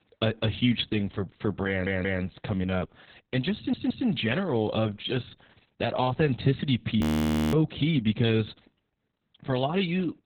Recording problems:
garbled, watery; badly
audio stuttering; at 1.5 s and at 3.5 s
audio freezing; at 7 s for 0.5 s

